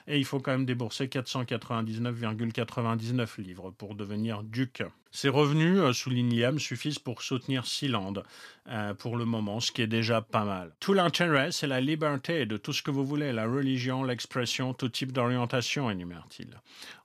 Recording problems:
none

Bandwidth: 14.5 kHz